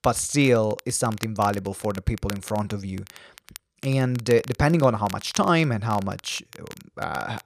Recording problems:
crackle, like an old record; noticeable; 20 dB below the speech

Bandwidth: 14.5 kHz